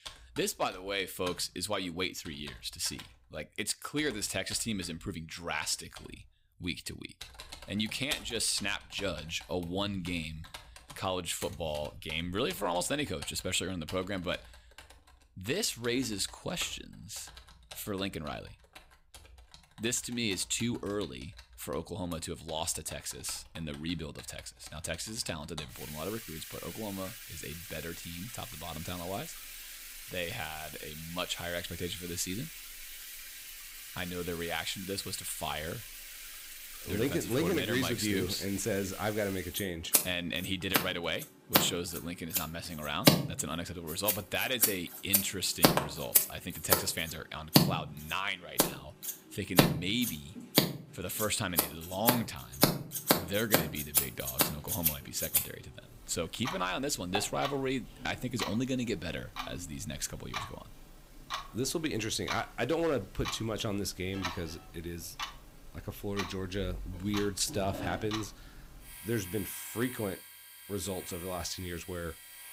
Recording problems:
household noises; very loud; throughout; 1 dB above the speech

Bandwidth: 15.5 kHz